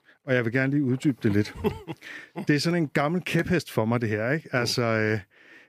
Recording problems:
none

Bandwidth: 15 kHz